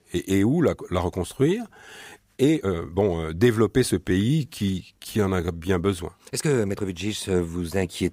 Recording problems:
uneven, jittery; strongly; from 1.5 to 7 s

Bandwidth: 15.5 kHz